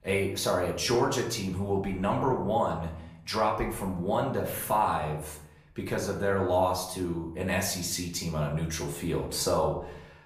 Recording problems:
off-mic speech; far
room echo; slight; dies away in 0.6 s

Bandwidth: 15 kHz